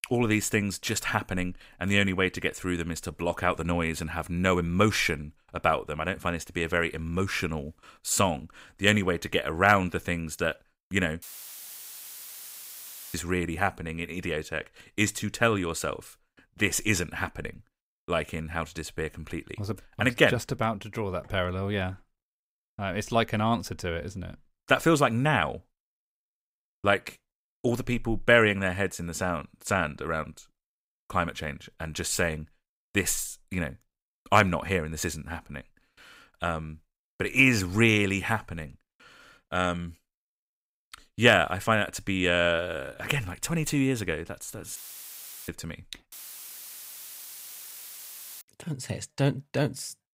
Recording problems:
audio cutting out; filled with static; at 11 s for 2 s, at 45 s for 0.5 s and at 46 s for 2.5 s

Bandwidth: 15.5 kHz